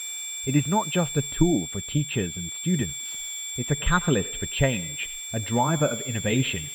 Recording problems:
muffled; very; fading above 3.5 kHz
echo of what is said; faint; from 3 s on; 90 ms later, 20 dB below the speech
high-pitched whine; loud; throughout; 7.5 kHz, 5 dB below the speech
hiss; faint; throughout; 20 dB below the speech

